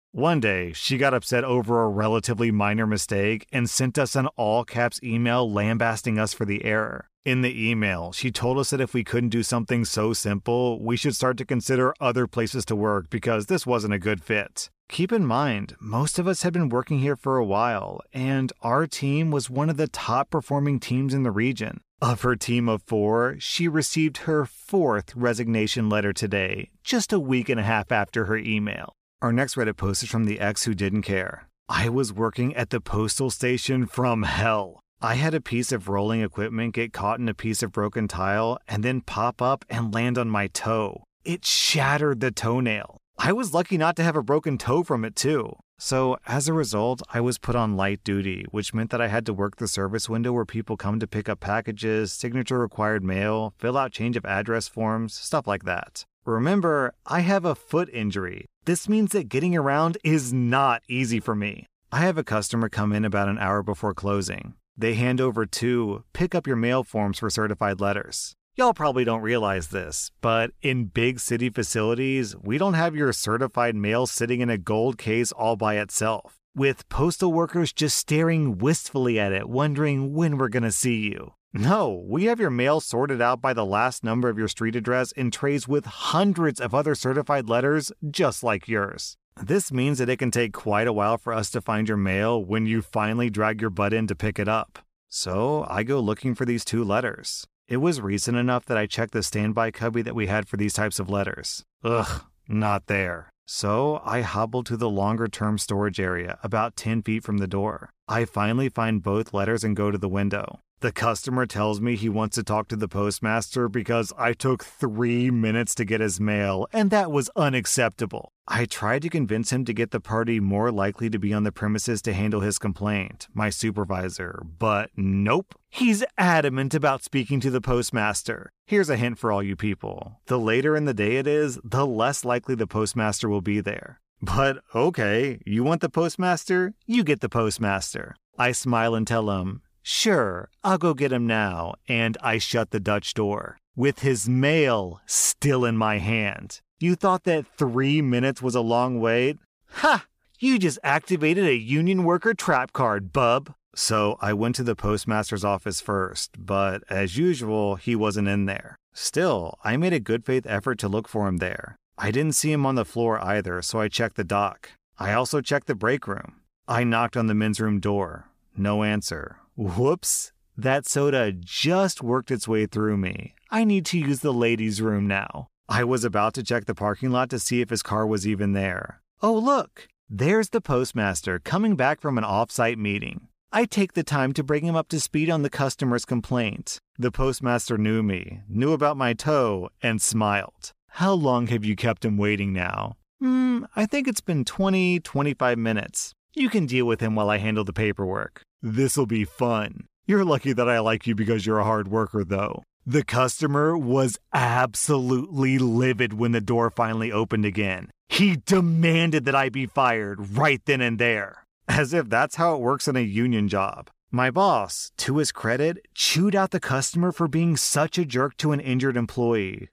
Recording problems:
none

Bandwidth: 14.5 kHz